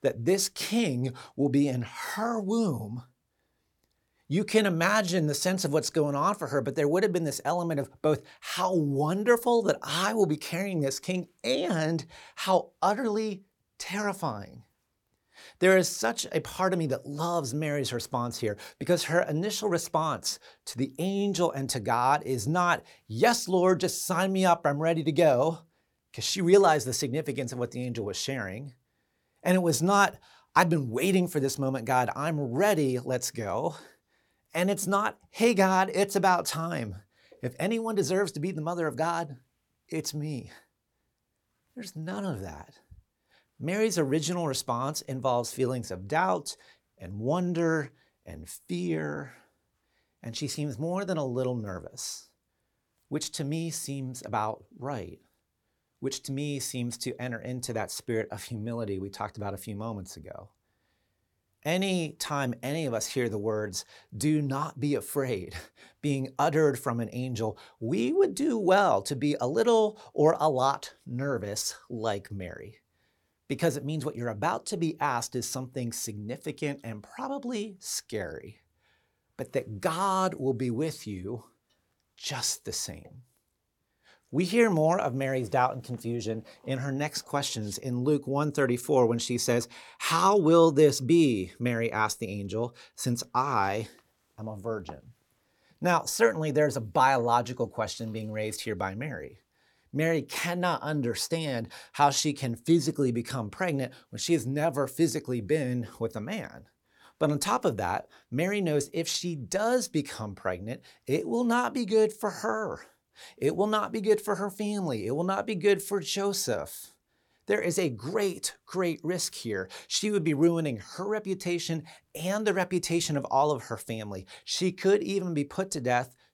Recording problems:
none

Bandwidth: 18 kHz